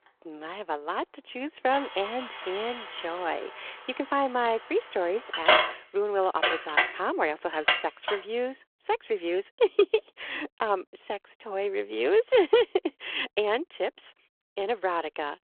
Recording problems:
phone-call audio
traffic noise; very loud; until 8 s; 1 dB above the speech

